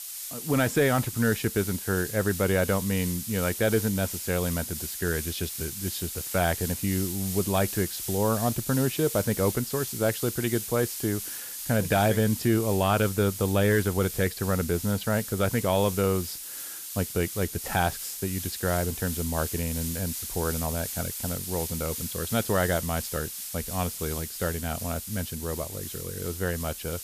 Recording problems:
hiss; loud; throughout; 6 dB below the speech
high-pitched whine; very faint; throughout; 6.5 kHz, 35 dB below the speech

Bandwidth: 14.5 kHz